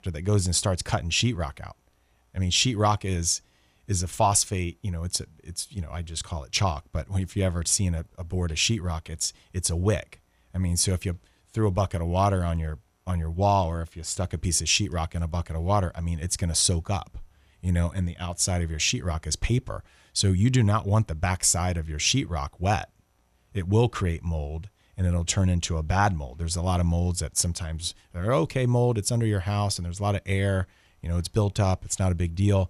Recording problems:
none

